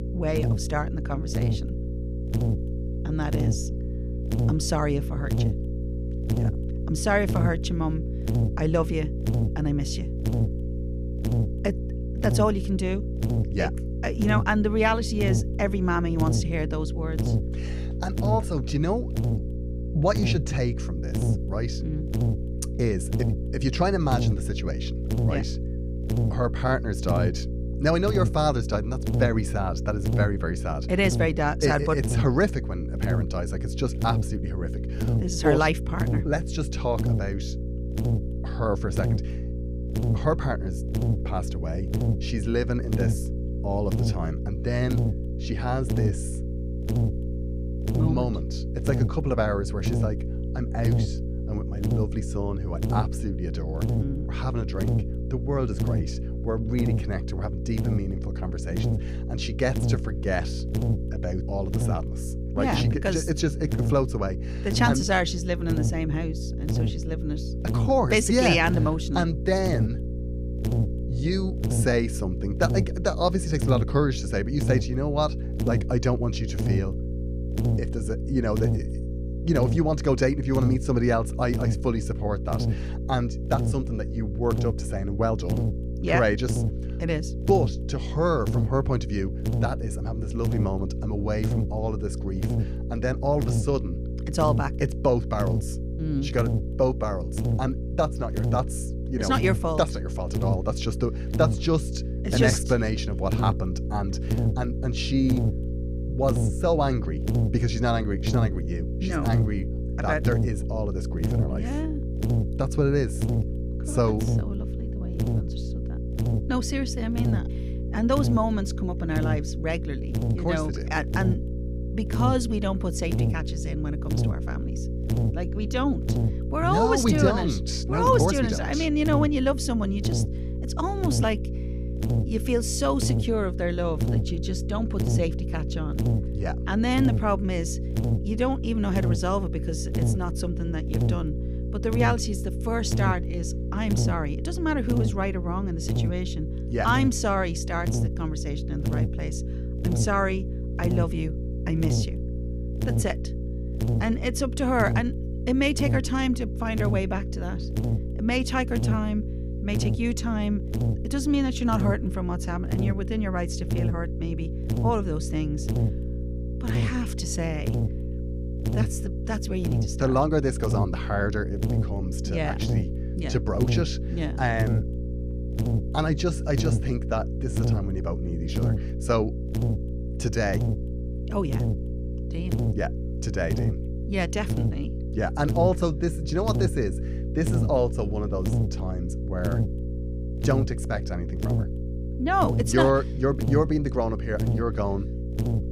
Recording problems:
electrical hum; loud; throughout; 60 Hz, 9 dB below the speech

